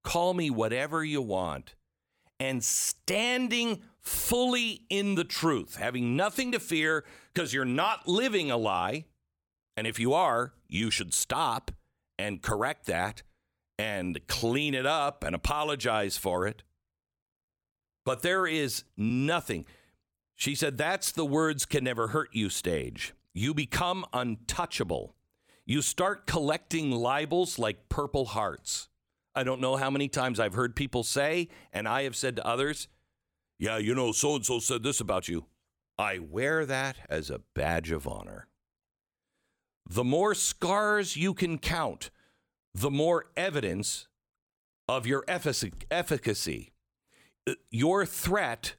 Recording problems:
uneven, jittery; slightly; from 3 to 28 s

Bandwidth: 17.5 kHz